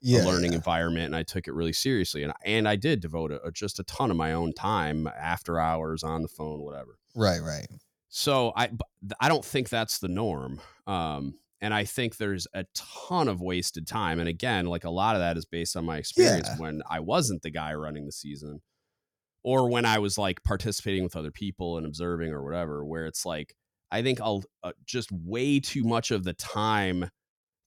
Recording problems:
none

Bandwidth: 19 kHz